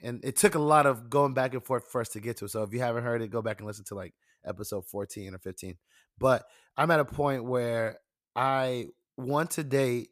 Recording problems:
none

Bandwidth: 14.5 kHz